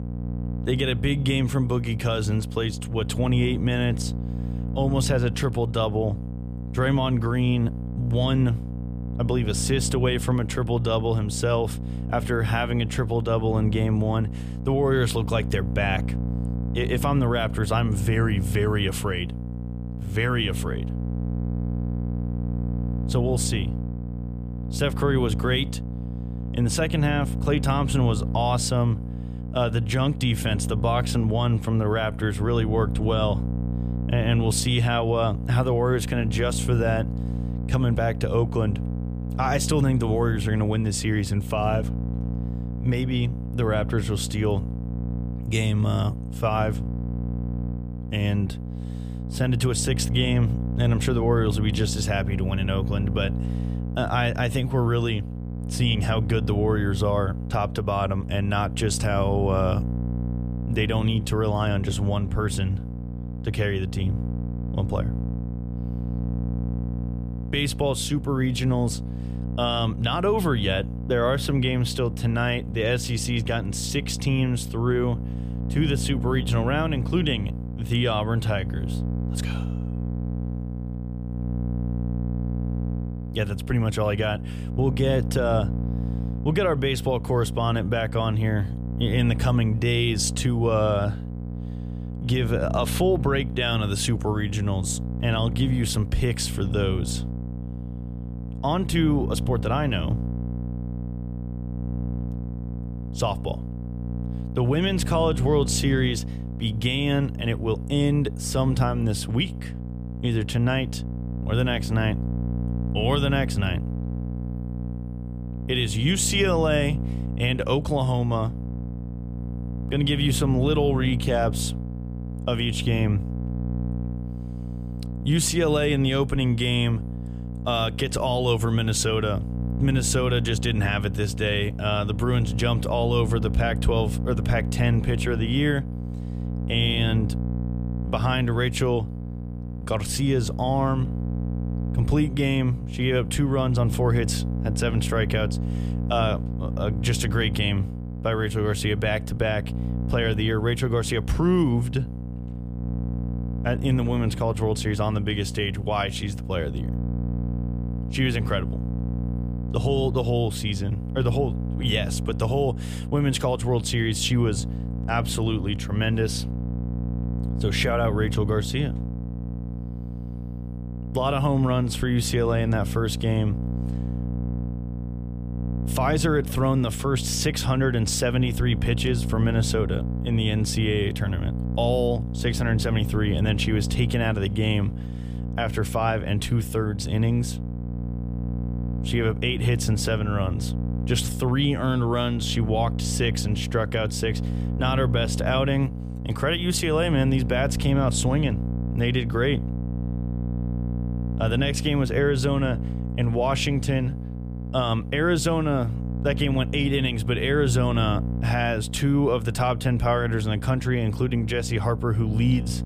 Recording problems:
electrical hum; noticeable; throughout; 60 Hz, 10 dB below the speech

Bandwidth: 15 kHz